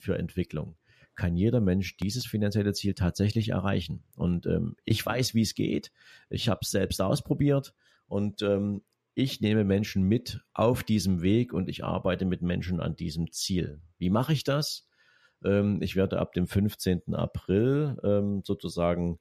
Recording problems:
none

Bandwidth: 14.5 kHz